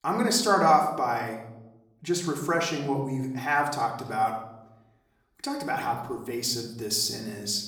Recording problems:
off-mic speech; far
room echo; slight; dies away in 0.7 s

